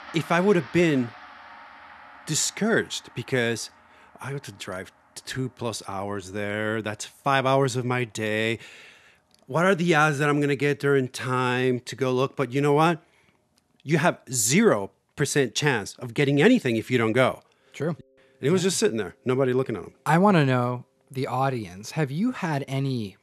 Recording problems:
background music; faint; throughout; 25 dB below the speech

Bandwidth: 13.5 kHz